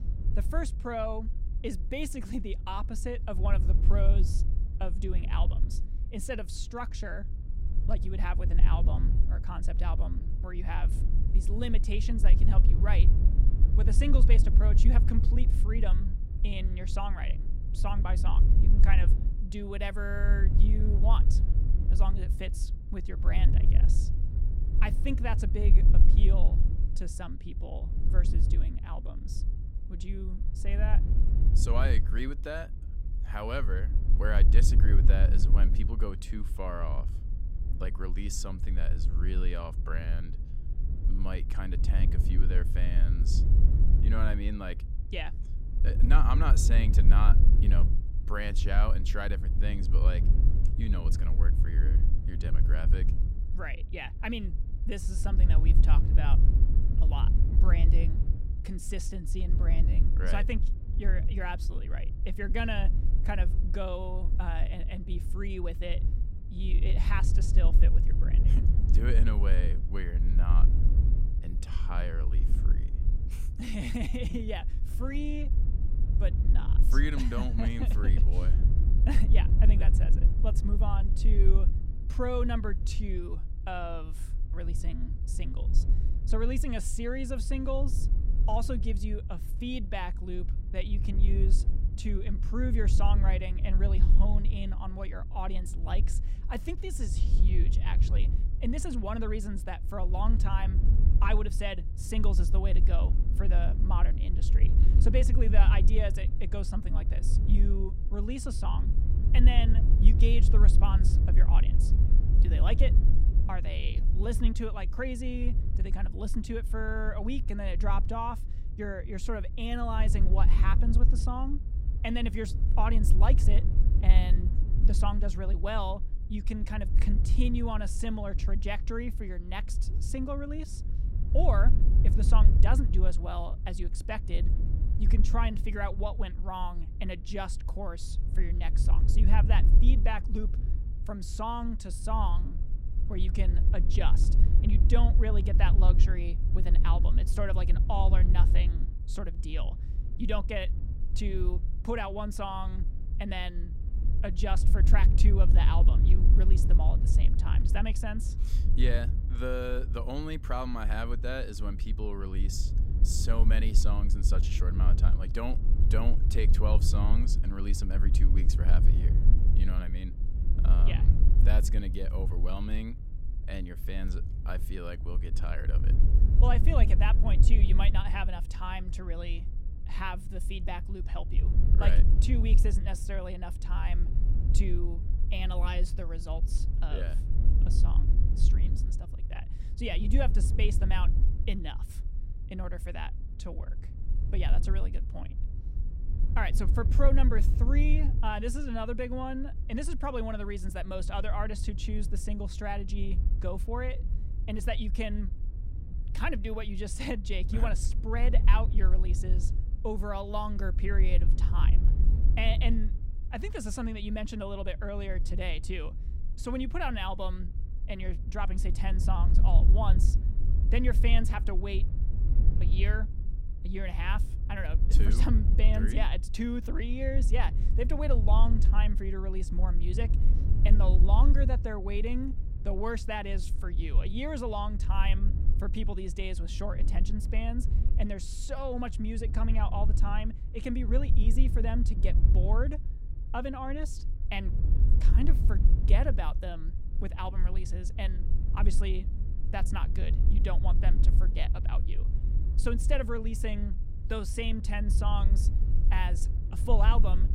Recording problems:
wind noise on the microphone; heavy; 10 dB below the speech

